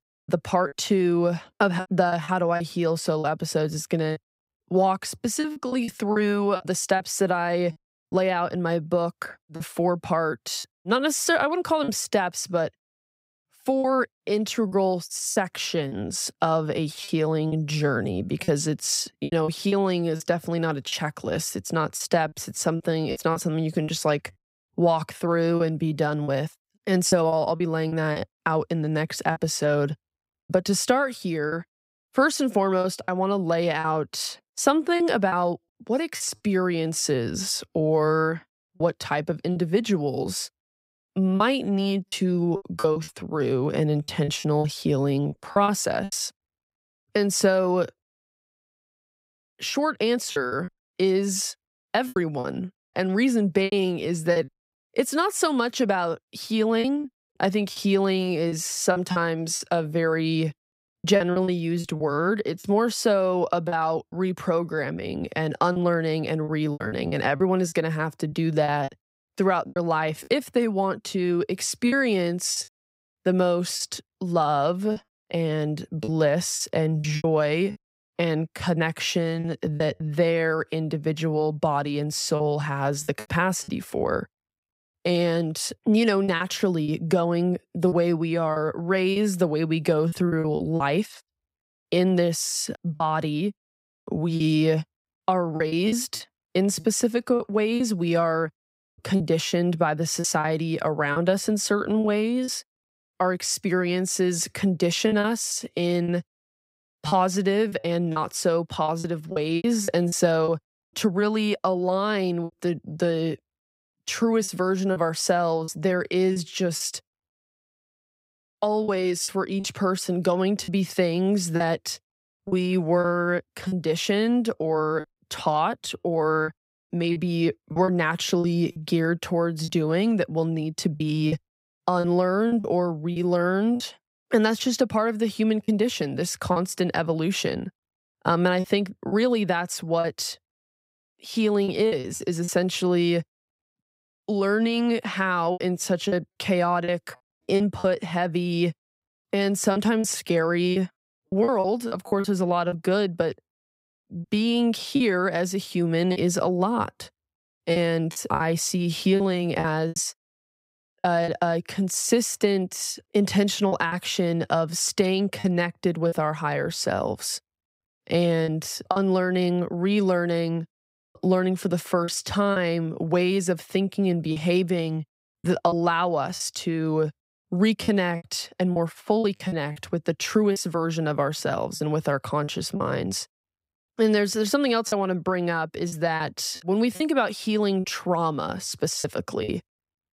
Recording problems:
choppy; very; 7% of the speech affected

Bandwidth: 15.5 kHz